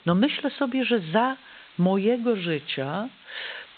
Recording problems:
high frequencies cut off; severe; nothing above 4 kHz
hiss; faint; throughout; 25 dB below the speech

